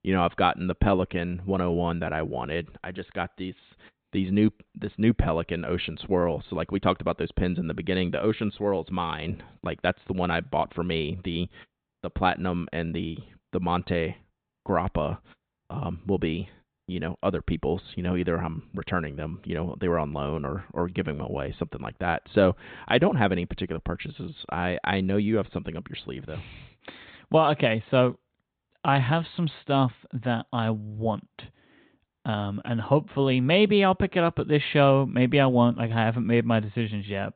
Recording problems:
high frequencies cut off; severe; nothing above 4 kHz

